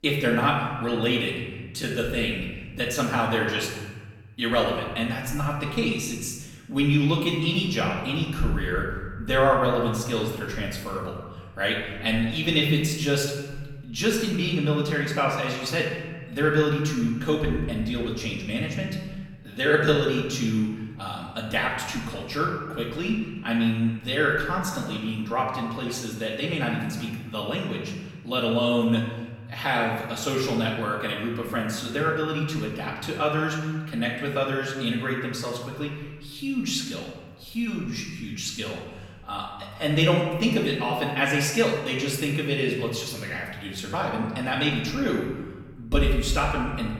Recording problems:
off-mic speech; far
room echo; noticeable; dies away in 1.3 s

